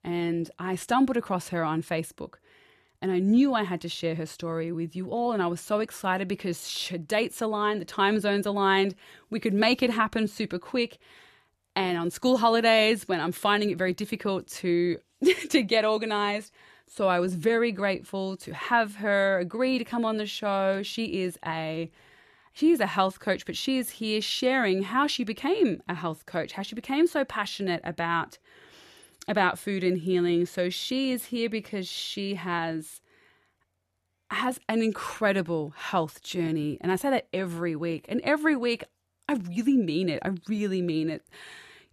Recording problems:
none

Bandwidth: 13.5 kHz